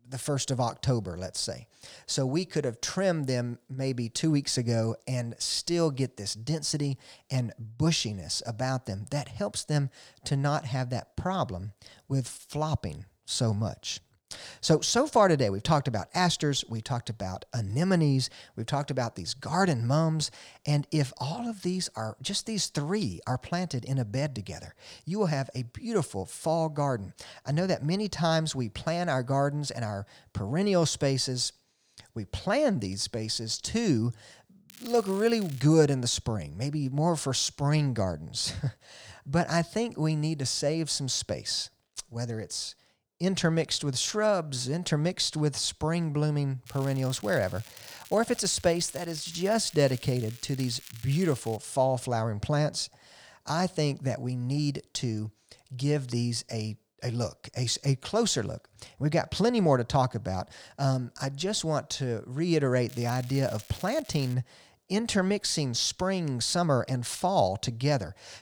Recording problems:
crackling; noticeable; at 35 s, from 47 to 52 s and from 1:03 to 1:04; 20 dB below the speech

